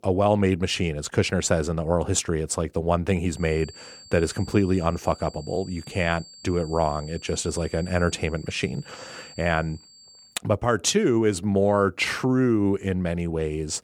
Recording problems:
high-pitched whine; faint; from 3.5 to 10 s; 4.5 kHz, 20 dB below the speech

